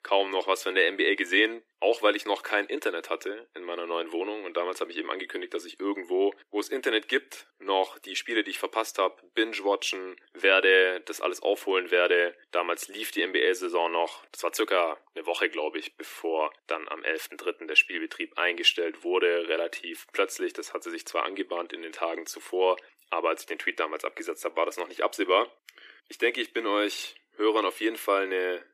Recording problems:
thin; very; fading below 300 Hz

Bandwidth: 14.5 kHz